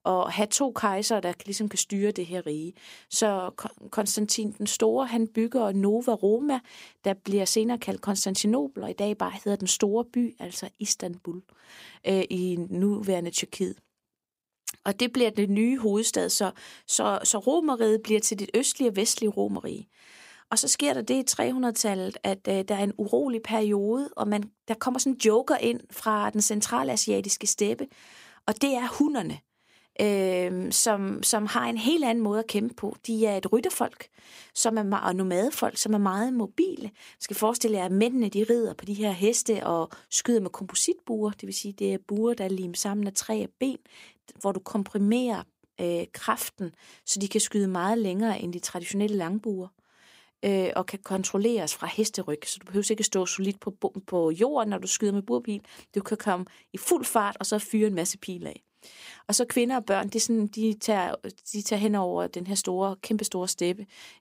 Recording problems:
none

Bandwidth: 15.5 kHz